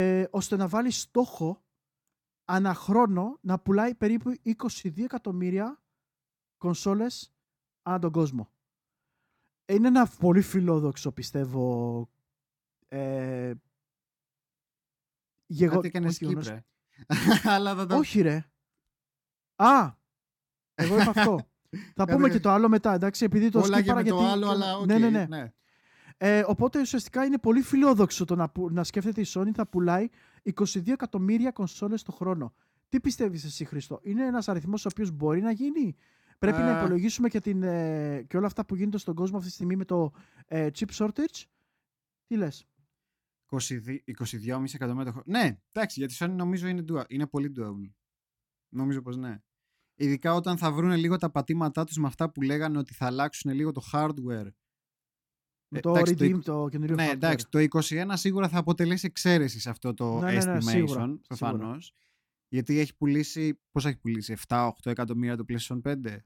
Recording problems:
abrupt cut into speech; at the start

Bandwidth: 17.5 kHz